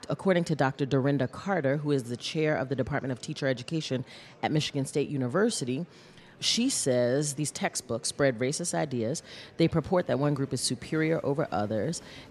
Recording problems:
murmuring crowd; faint; throughout; 25 dB below the speech

